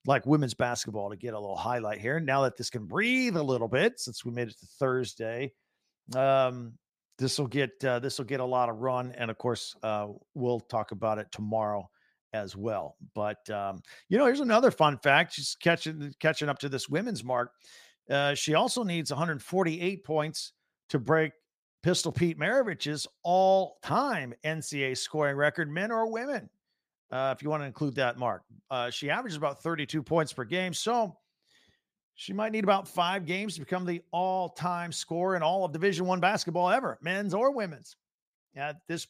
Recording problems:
none

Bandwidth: 15 kHz